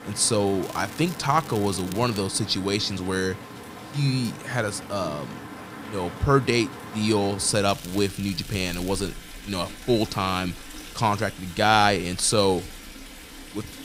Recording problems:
rain or running water; noticeable; throughout; 15 dB below the speech
crackling; noticeable; from 0.5 to 2 s and from 7.5 to 9 s; 20 dB below the speech

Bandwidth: 15.5 kHz